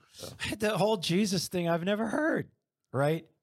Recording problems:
none

